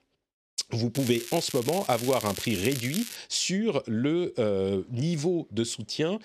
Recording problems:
crackling; loud; from 1 to 3 s; 8 dB below the speech

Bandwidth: 14 kHz